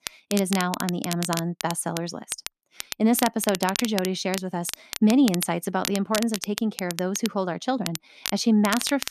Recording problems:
crackle, like an old record; loud; 8 dB below the speech

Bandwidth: 13.5 kHz